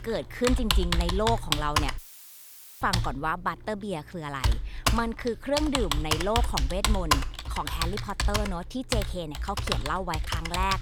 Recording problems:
household noises; very loud; throughout; 2 dB above the speech
audio cutting out; filled with static; at 2 s for 1 s

